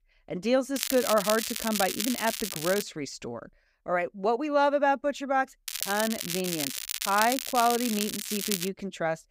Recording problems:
crackling; loud; from 1 to 3 s and from 5.5 to 8.5 s; 3 dB below the speech

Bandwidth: 15.5 kHz